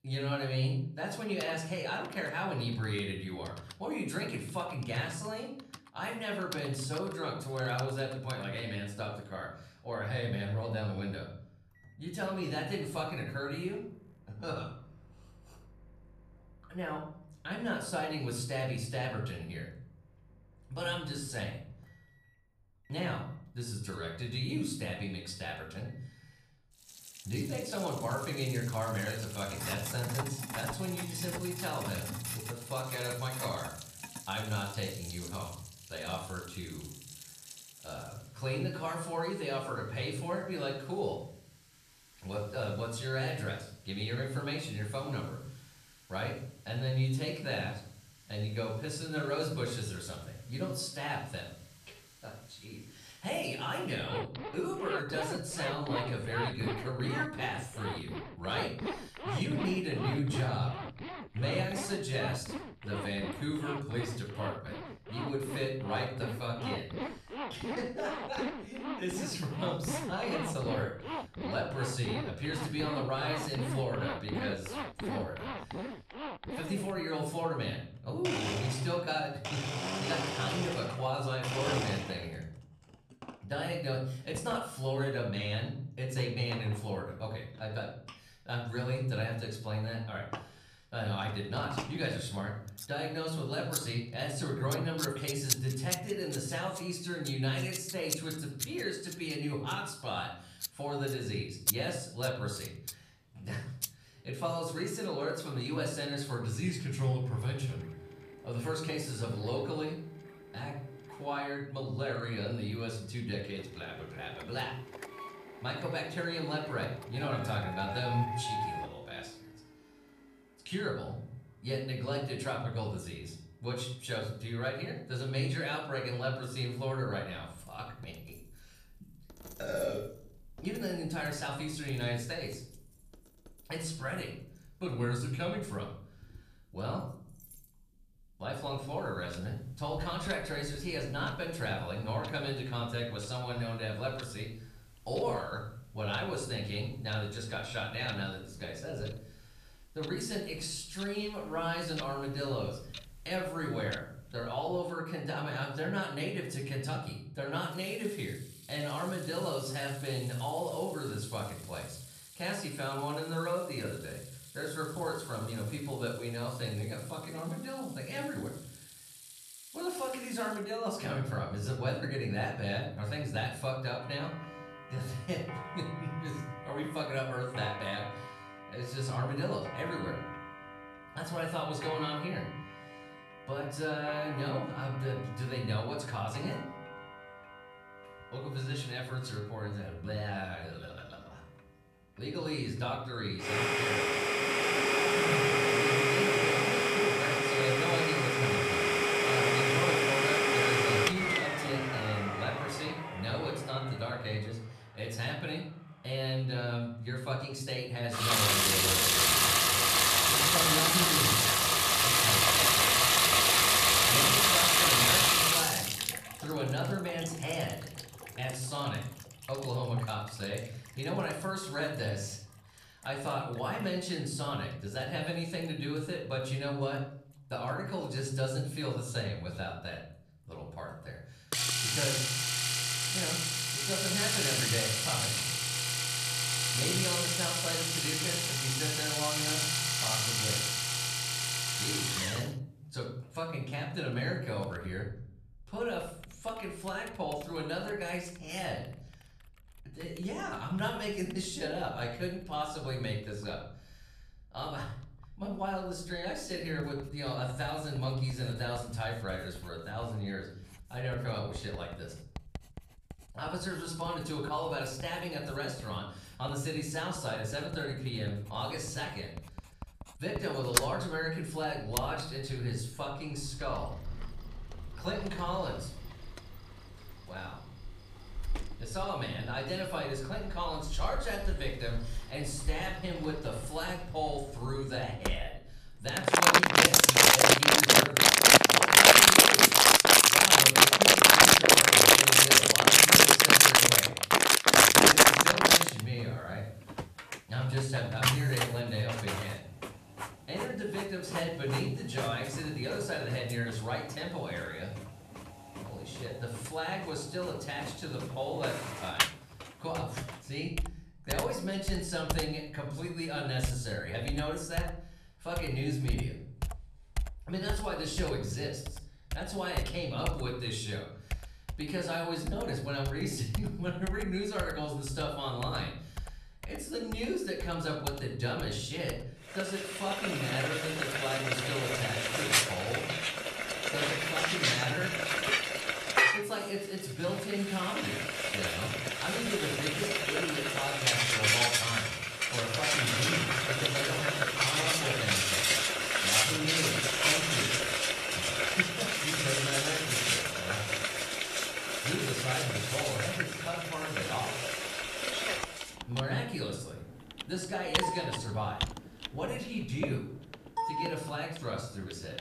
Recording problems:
room echo; noticeable; dies away in 0.6 s
off-mic speech; somewhat distant
household noises; very loud; throughout; 10 dB above the speech

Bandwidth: 14.5 kHz